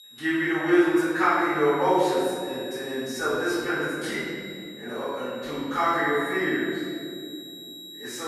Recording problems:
room echo; strong; dies away in 2.7 s
off-mic speech; far
high-pitched whine; noticeable; throughout; 4 kHz, 15 dB below the speech
abrupt cut into speech; at the end

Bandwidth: 14.5 kHz